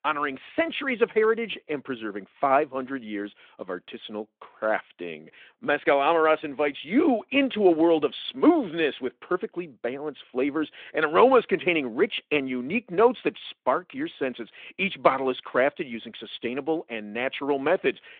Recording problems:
phone-call audio

